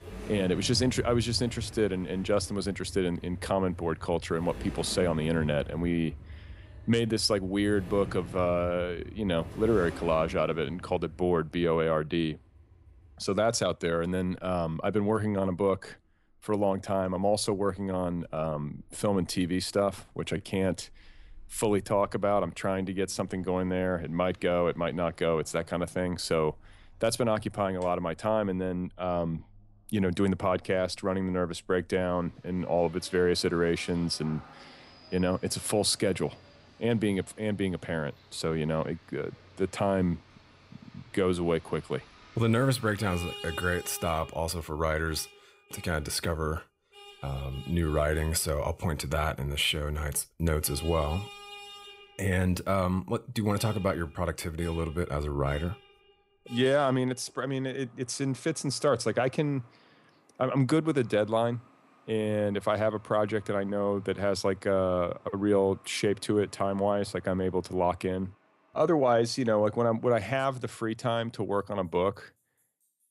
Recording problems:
traffic noise; noticeable; throughout; 15 dB below the speech

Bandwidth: 15.5 kHz